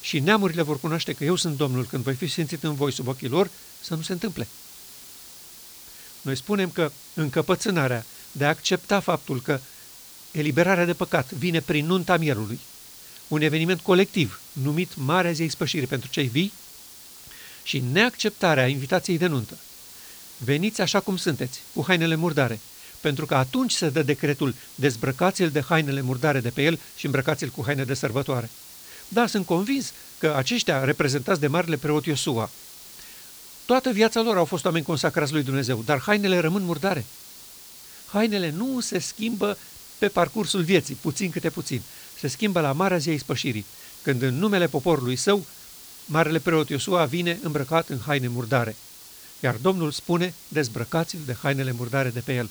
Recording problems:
hiss; noticeable; throughout; 15 dB below the speech

